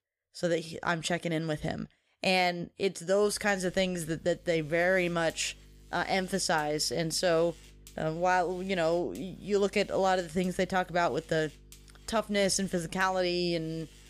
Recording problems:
electrical hum; faint; from 3 s on; 50 Hz, 25 dB below the speech

